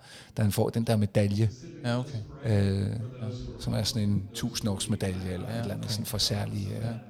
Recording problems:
background chatter; noticeable; throughout; 3 voices, 15 dB below the speech

